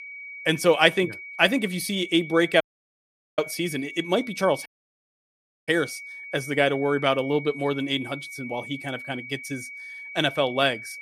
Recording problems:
high-pitched whine; noticeable; throughout; 2.5 kHz, 15 dB below the speech
audio cutting out; at 2.5 s for 1 s and at 4.5 s for 1 s

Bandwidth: 14.5 kHz